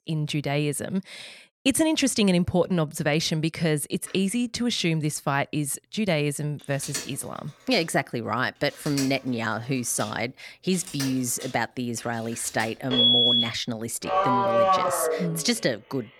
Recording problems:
alarms or sirens; very loud; from 4.5 s on; 3 dB above the speech

